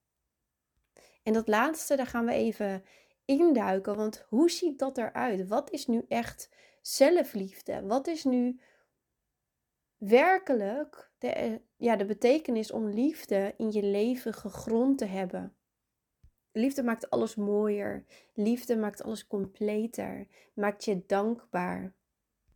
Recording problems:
none

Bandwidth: 18.5 kHz